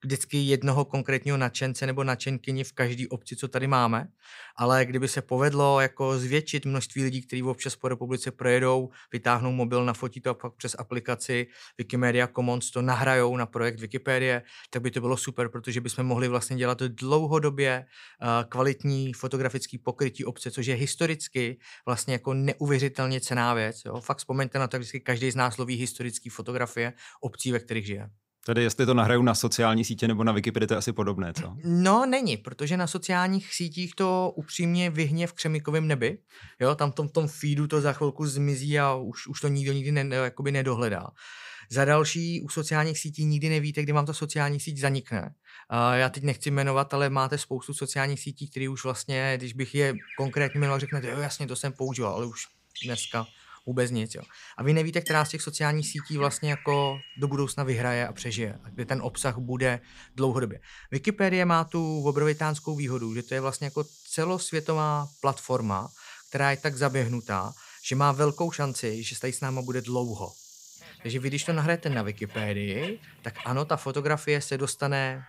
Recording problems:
animal sounds; noticeable; from 50 s on; 15 dB below the speech

